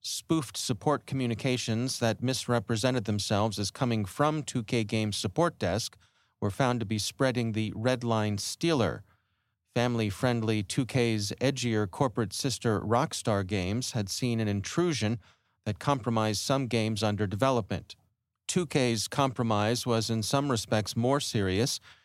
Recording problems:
none

